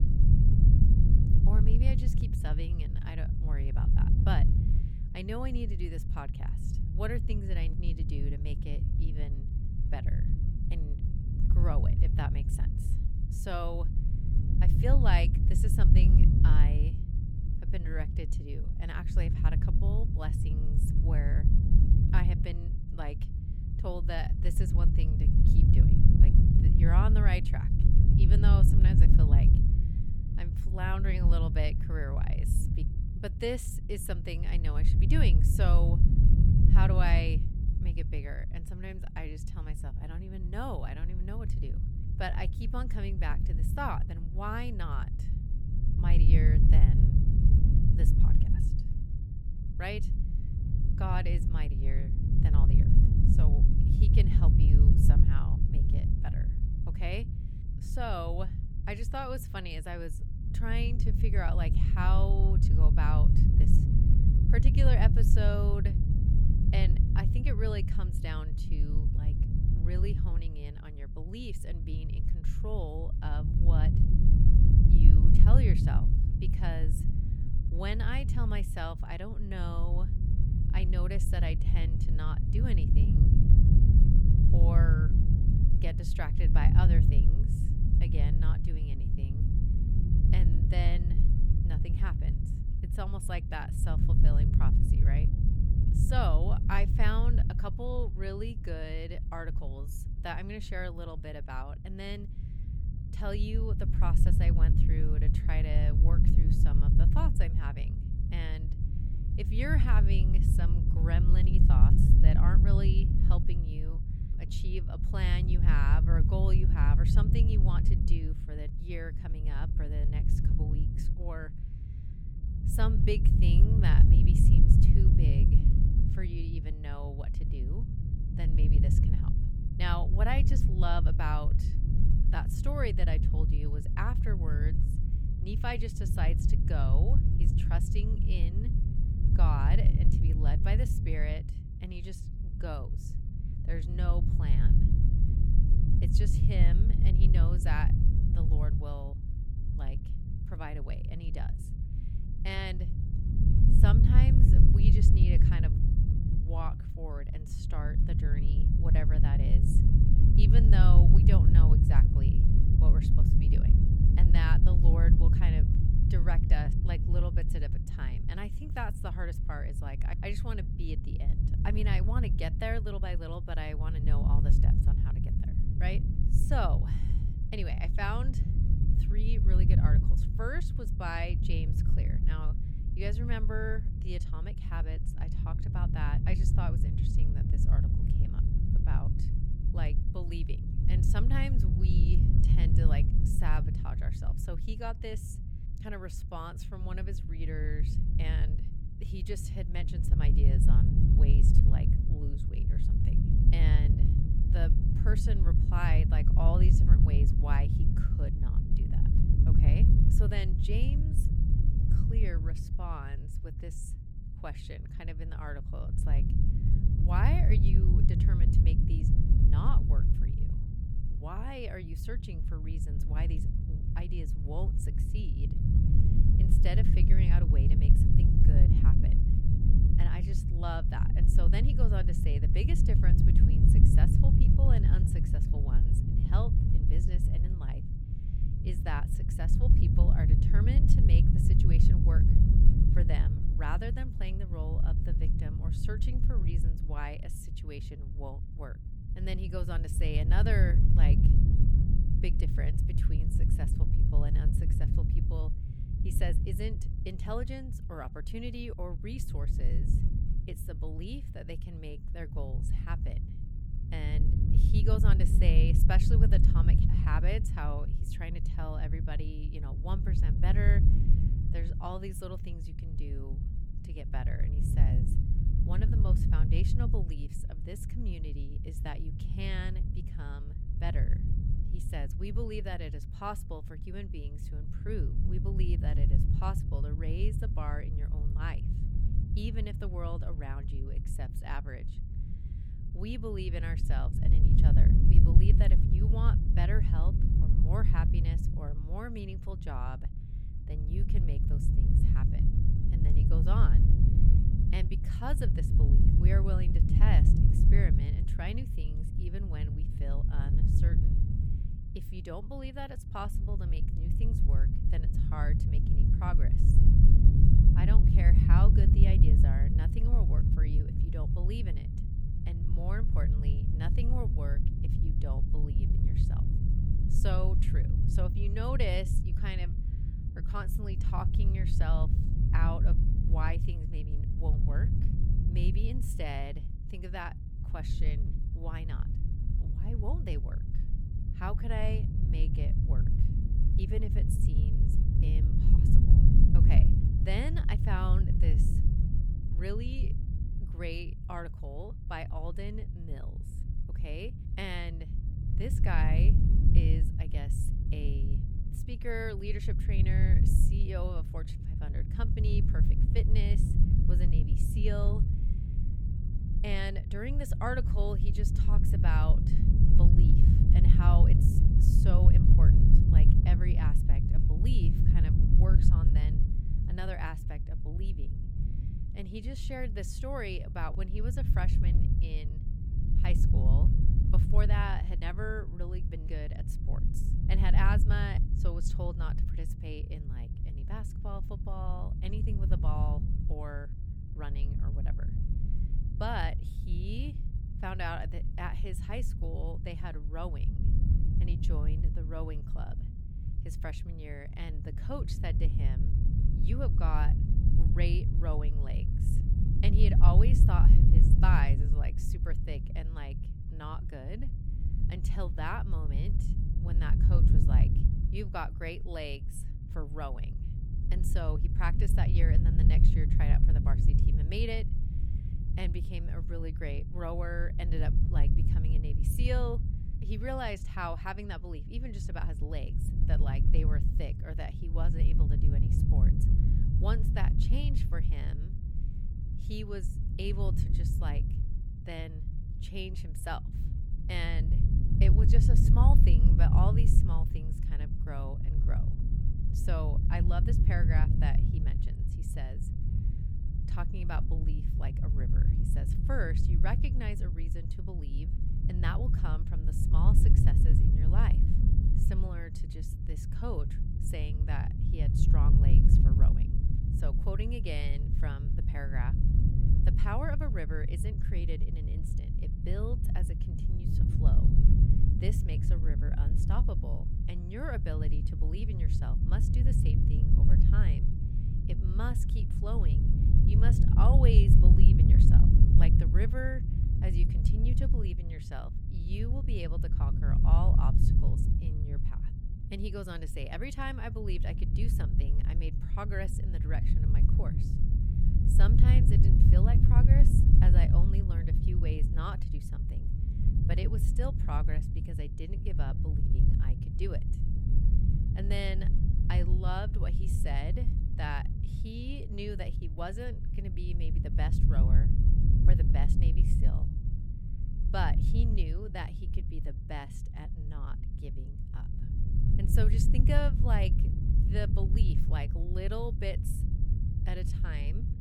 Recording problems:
low rumble; loud; throughout; 2 dB below the speech

